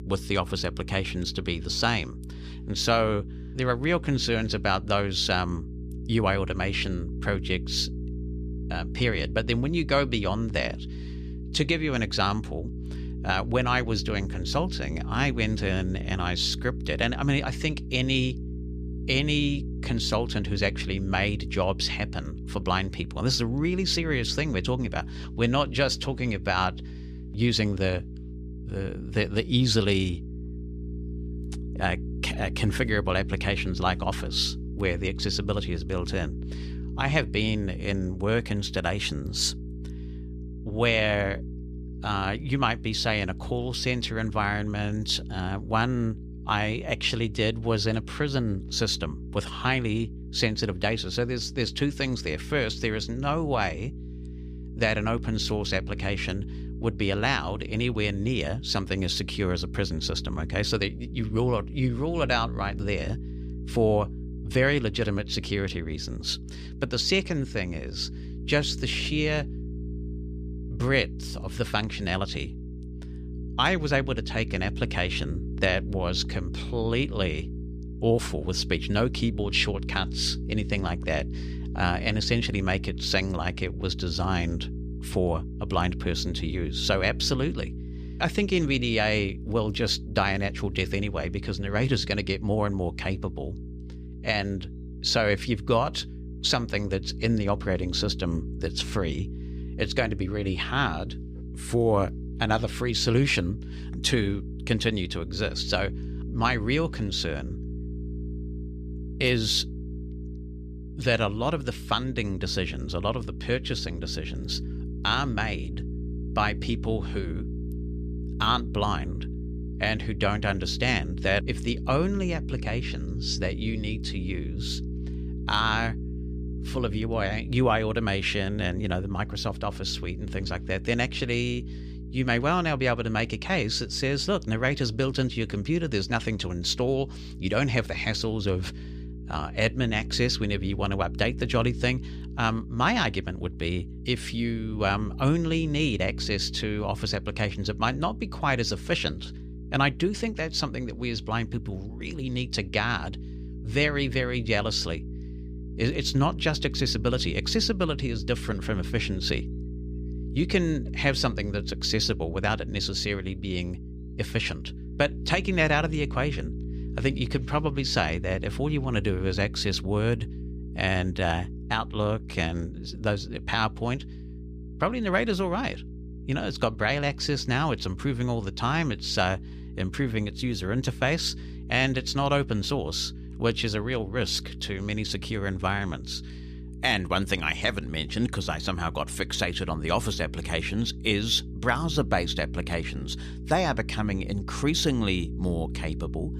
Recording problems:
electrical hum; noticeable; throughout; 60 Hz, 20 dB below the speech

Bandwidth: 14.5 kHz